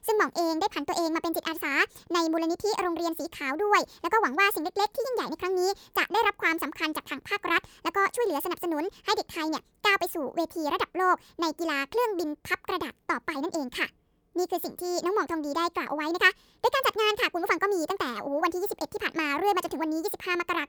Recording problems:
wrong speed and pitch; too fast and too high; 1.5 times normal speed

